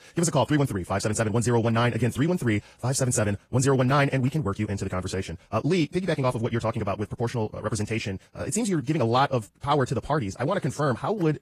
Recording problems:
wrong speed, natural pitch; too fast; 1.8 times normal speed
garbled, watery; slightly; nothing above 14.5 kHz

